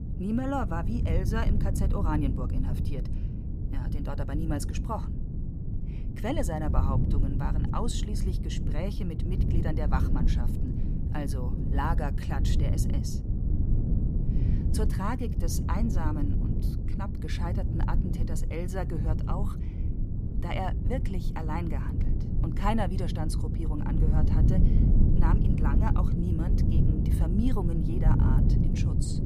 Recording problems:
low rumble; loud; throughout; 4 dB below the speech

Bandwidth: 15 kHz